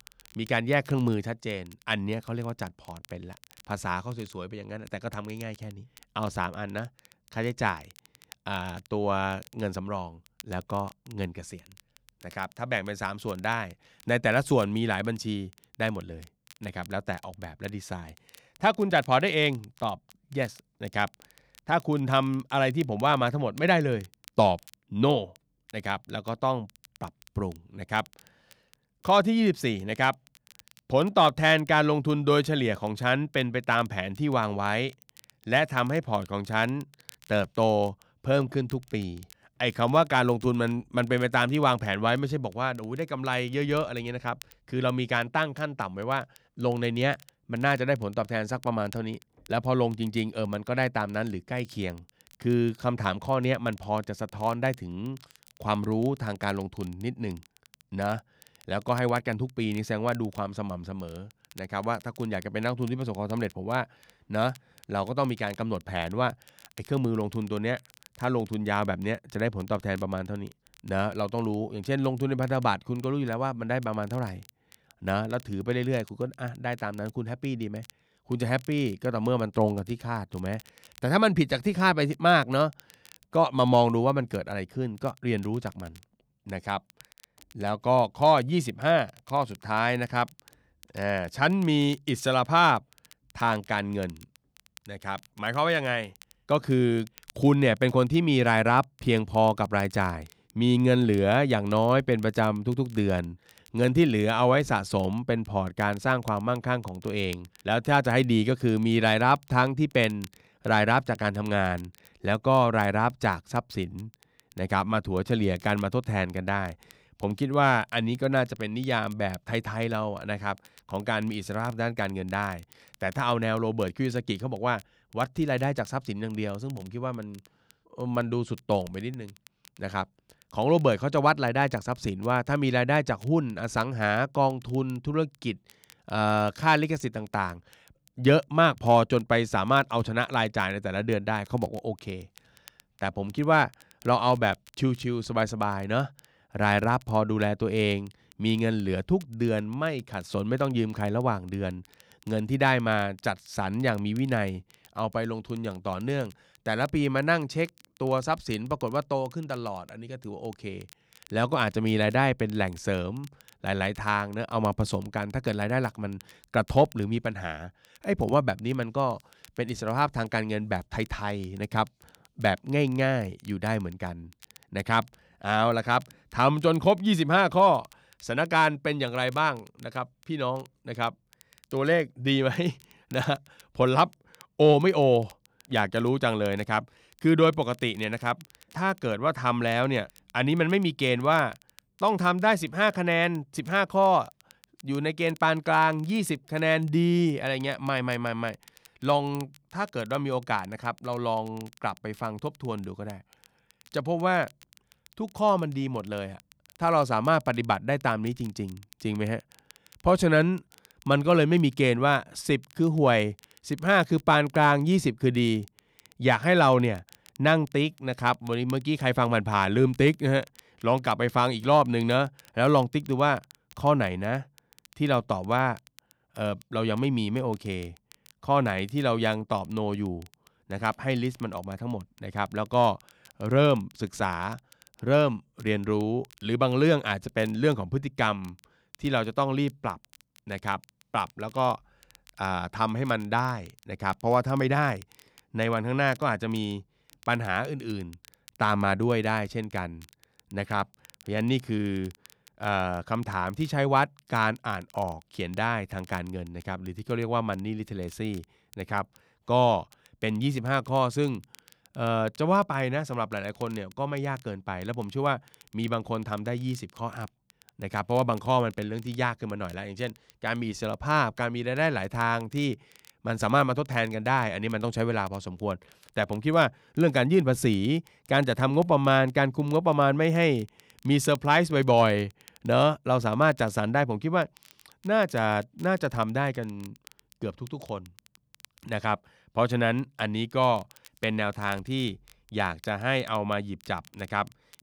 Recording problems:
crackle, like an old record; faint; 30 dB below the speech

